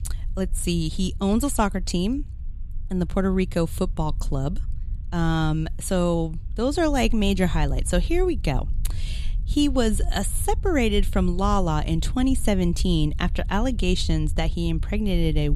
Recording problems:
low rumble; faint; throughout; 25 dB below the speech
abrupt cut into speech; at the end

